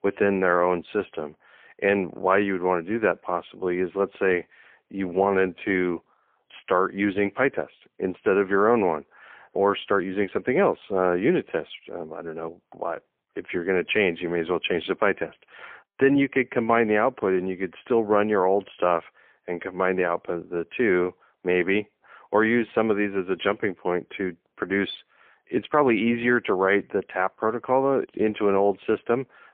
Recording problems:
phone-call audio; poor line; nothing above 3.5 kHz

